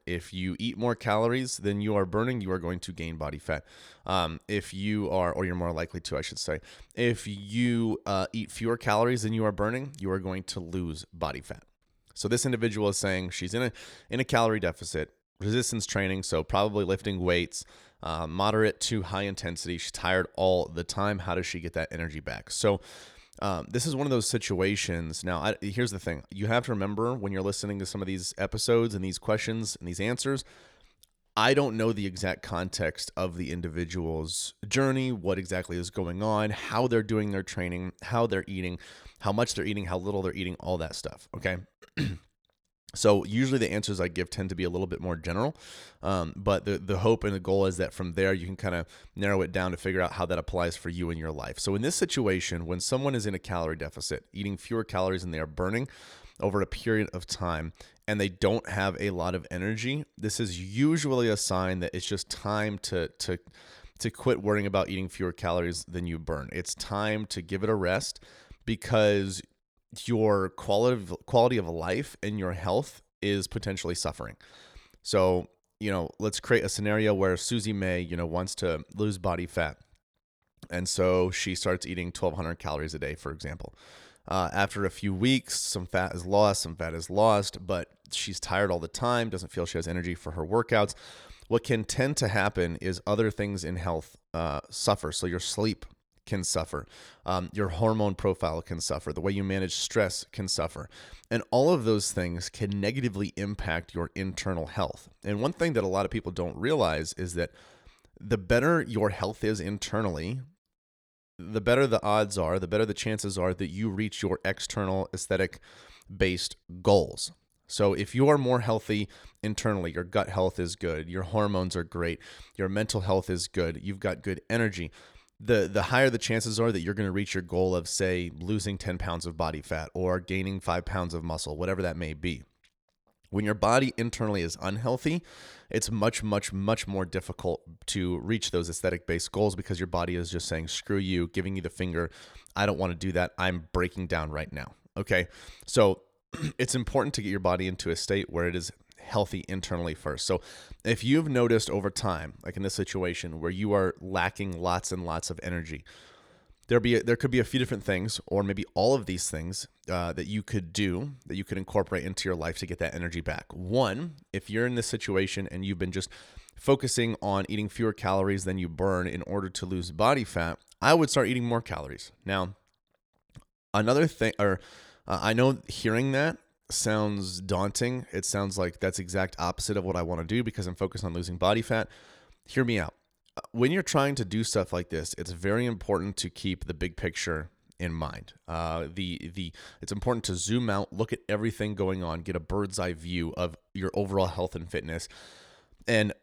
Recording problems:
none

